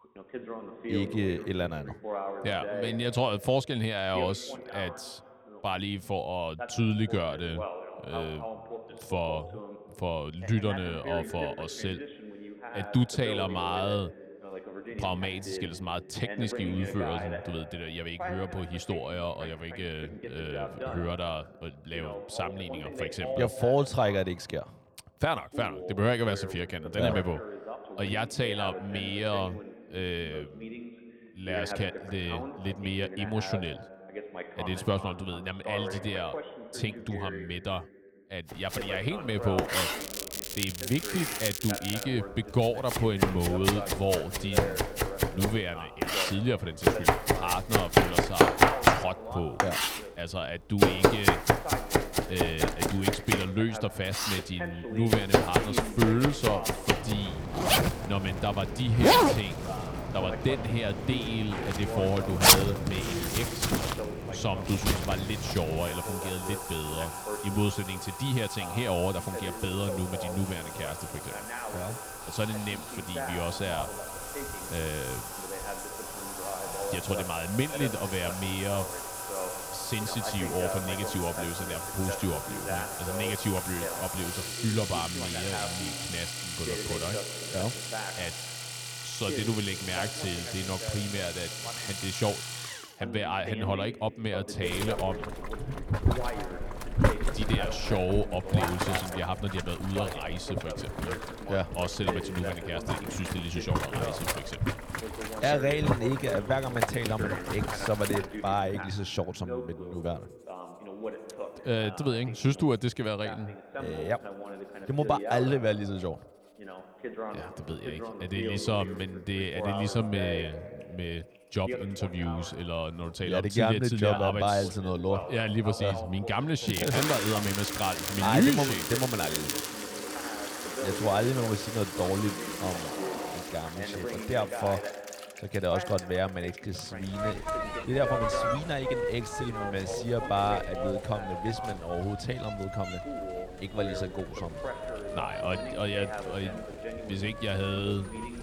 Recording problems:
household noises; very loud; from 39 s on; 1 dB above the speech
voice in the background; loud; throughout; 8 dB below the speech
crackling; loud; from 40 to 42 s and from 2:07 to 2:10; 3 dB below the speech

